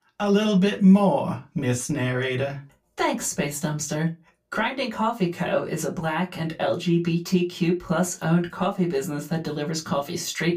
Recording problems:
room echo; very slight; dies away in 0.2 s
off-mic speech; somewhat distant

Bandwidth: 15 kHz